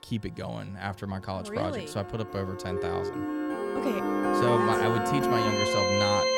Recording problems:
background music; very loud; throughout; 4 dB above the speech
siren; noticeable; from 2.5 to 4.5 s; peak level with the speech

